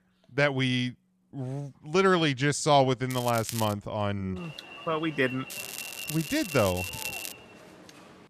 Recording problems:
crackling; noticeable; at 3 s and from 5.5 to 7.5 s; 10 dB below the speech
alarm; noticeable; from 4.5 s on; peak 8 dB below the speech

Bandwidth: 14.5 kHz